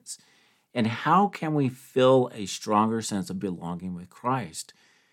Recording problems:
none

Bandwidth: 17 kHz